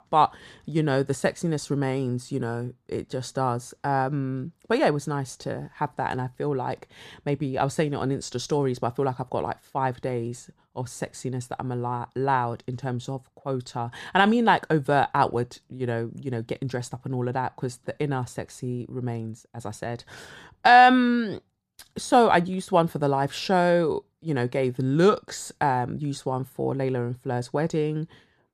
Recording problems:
none

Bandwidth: 14.5 kHz